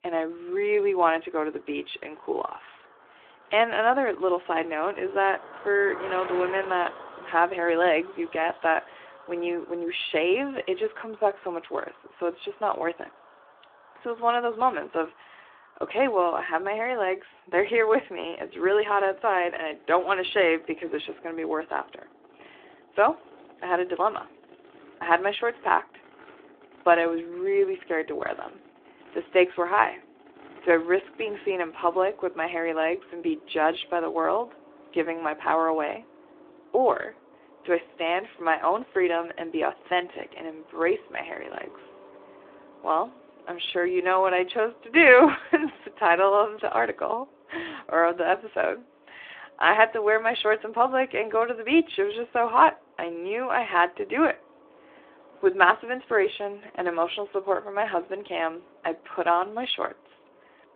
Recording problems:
phone-call audio; nothing above 3.5 kHz
traffic noise; faint; throughout; 25 dB below the speech

